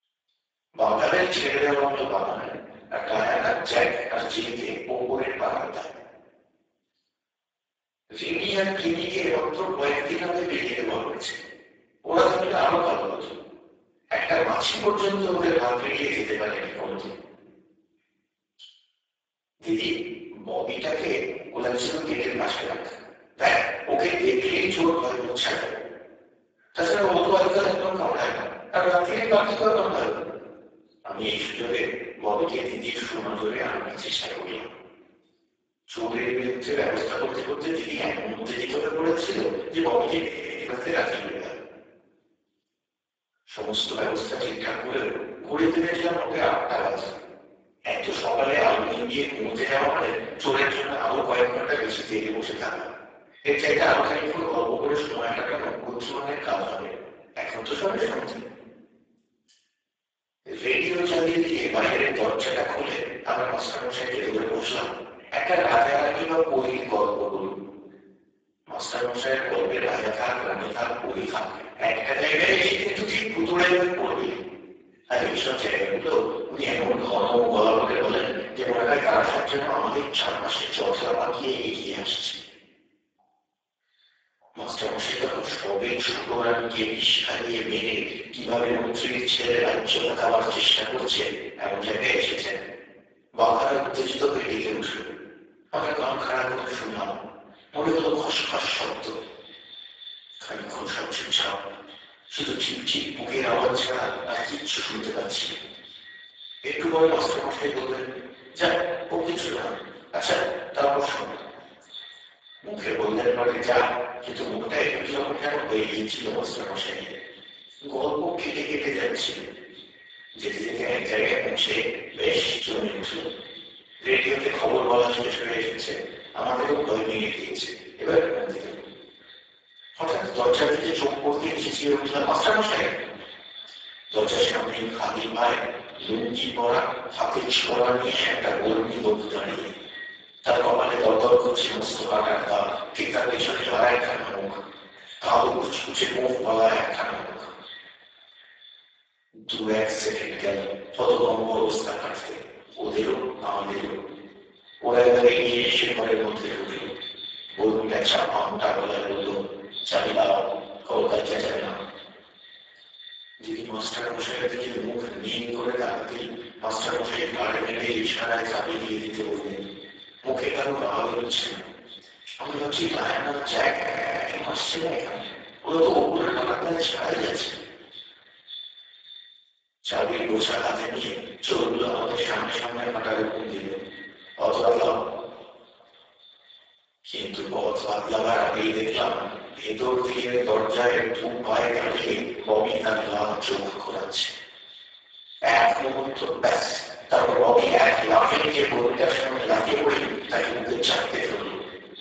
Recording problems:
room echo; strong; dies away in 1.1 s
off-mic speech; far
garbled, watery; badly; nothing above 7.5 kHz
echo of what is said; noticeable; from 1:39 on; 560 ms later, 15 dB below the speech
thin; somewhat; fading below 650 Hz
audio freezing; at 40 s and at 2:54 for 0.5 s

